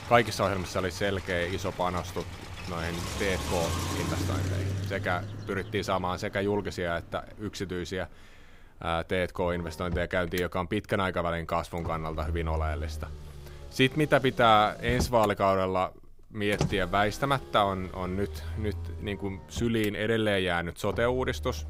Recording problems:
traffic noise; loud; throughout; 8 dB below the speech

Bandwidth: 15.5 kHz